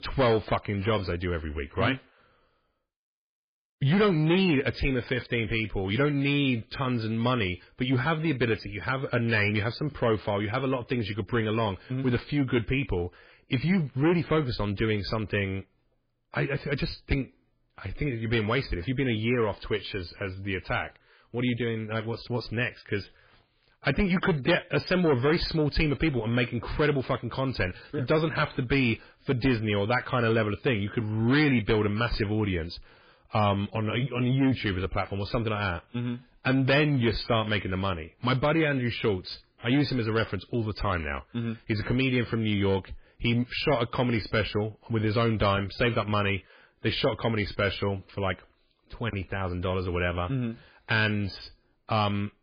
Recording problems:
garbled, watery; badly; nothing above 5 kHz
distortion; slight; 10 dB below the speech

